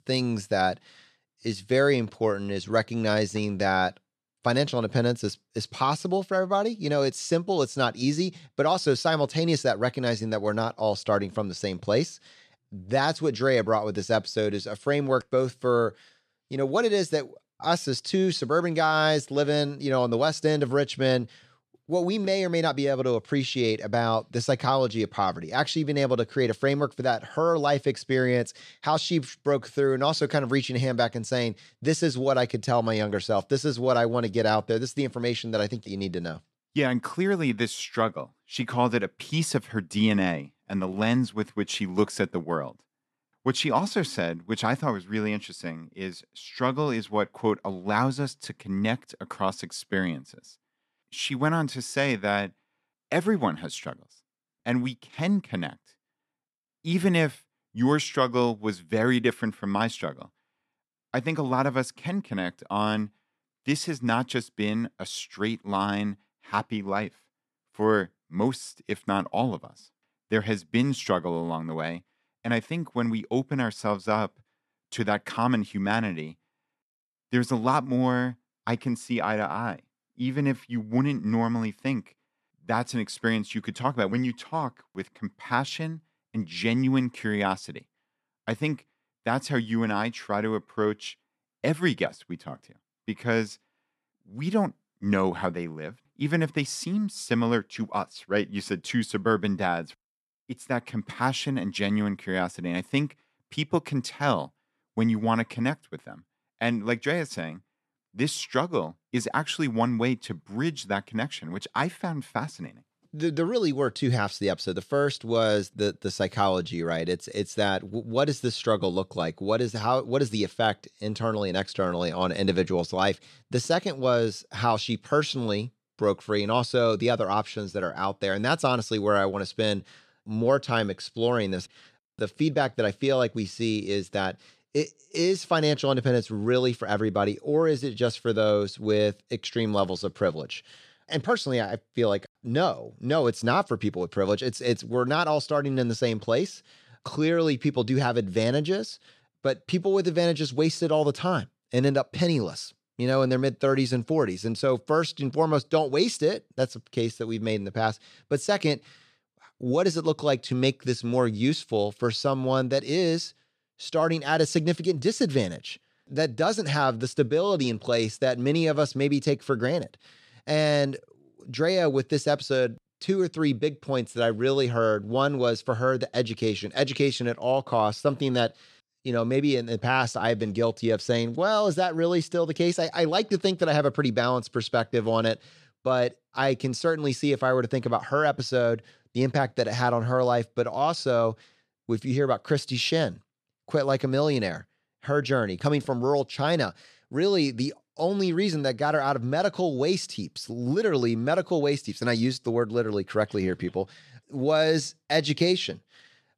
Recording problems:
none

